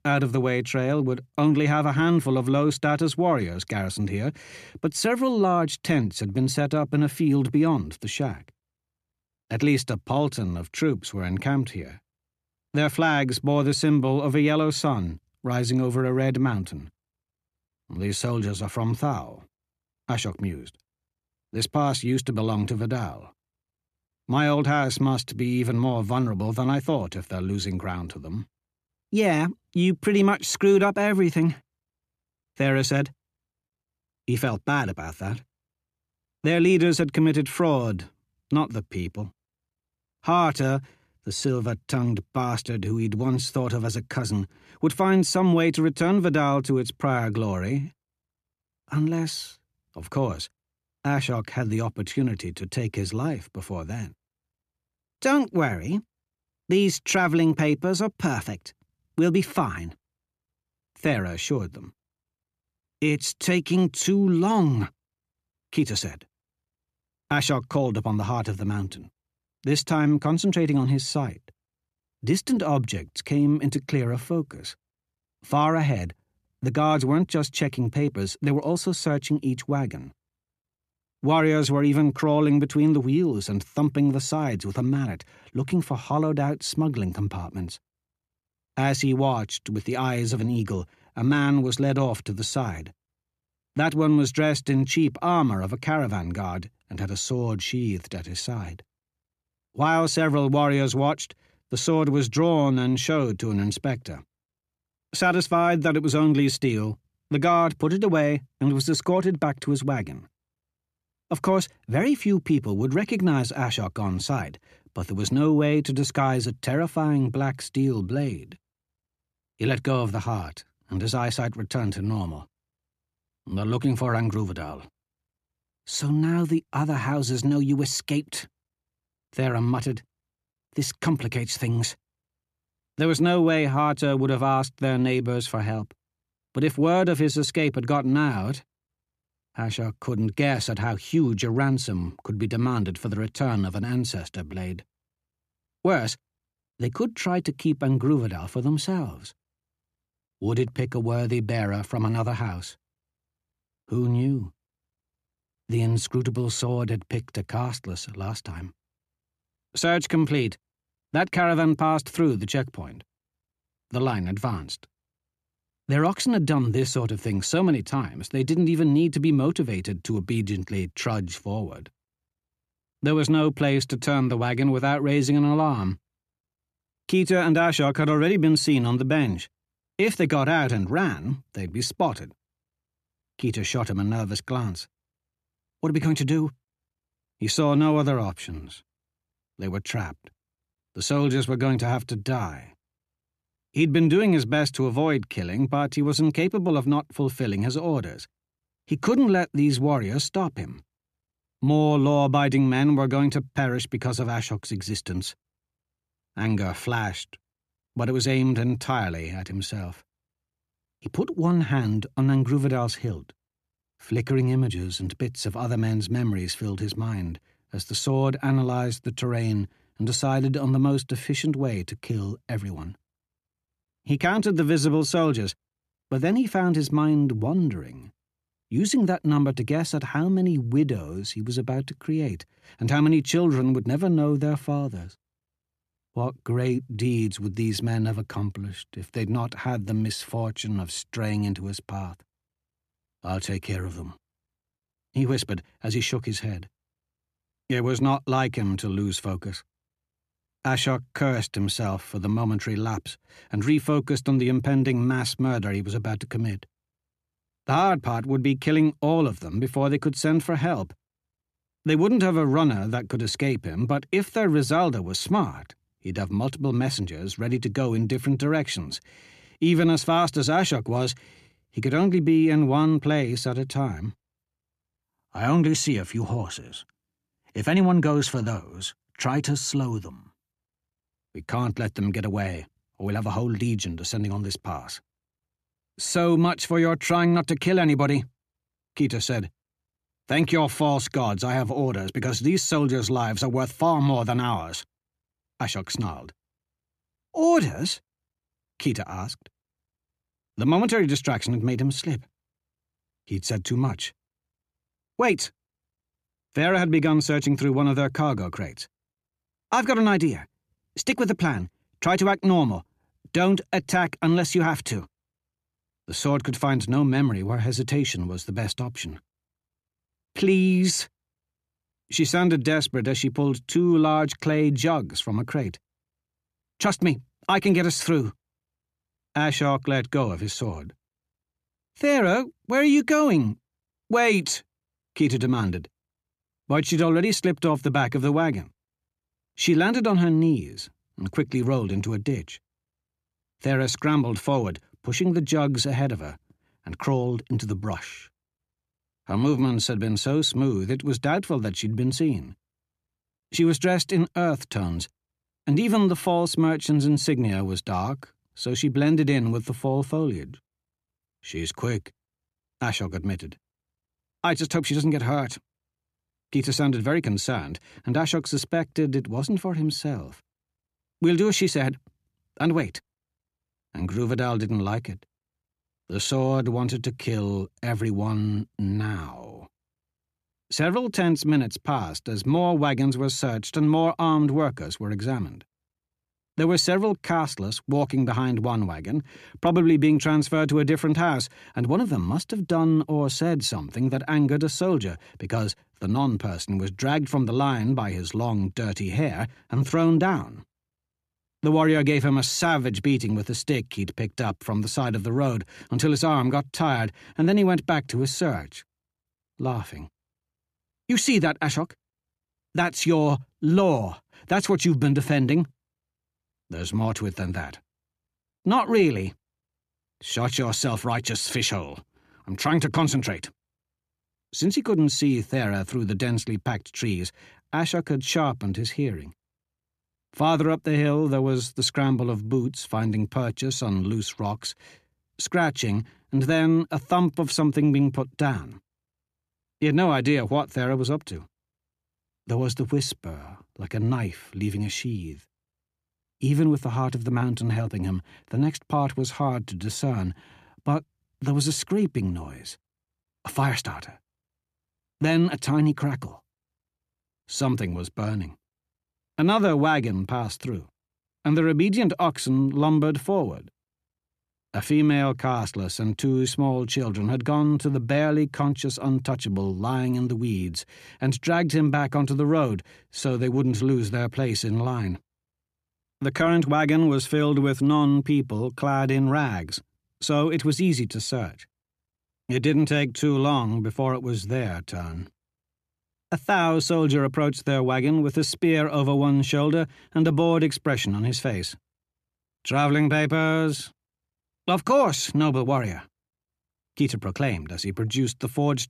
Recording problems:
none

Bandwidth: 14.5 kHz